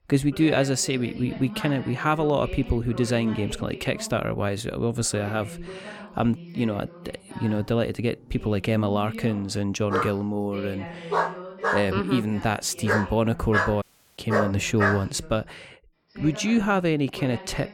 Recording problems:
voice in the background; noticeable; throughout; 15 dB below the speech
dog barking; noticeable; from 10 to 15 s; peak level with the speech
audio cutting out; at 14 s

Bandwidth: 17 kHz